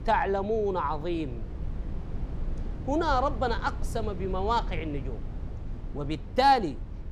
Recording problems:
low rumble; faint; throughout; 20 dB below the speech

